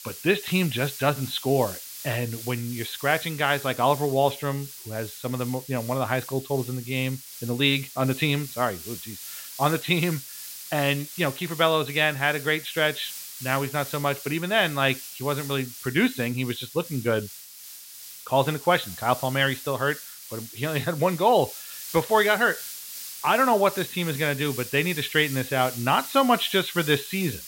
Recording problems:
high frequencies cut off; severe; nothing above 4 kHz
hiss; noticeable; throughout; 10 dB below the speech

